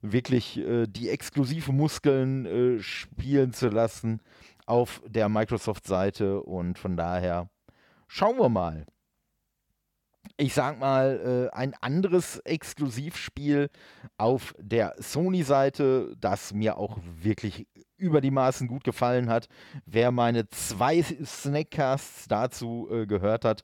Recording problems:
uneven, jittery; strongly; from 2.5 to 22 s

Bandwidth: 17 kHz